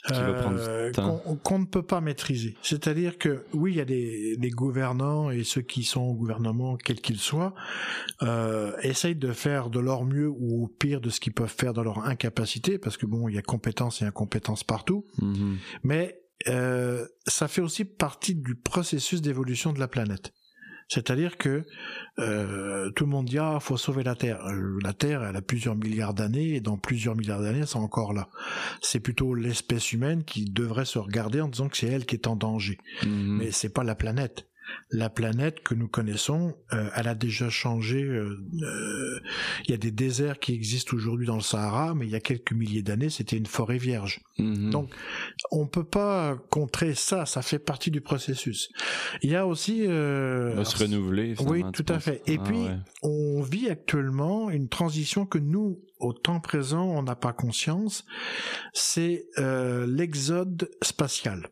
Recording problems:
squashed, flat; heavily

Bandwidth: 14.5 kHz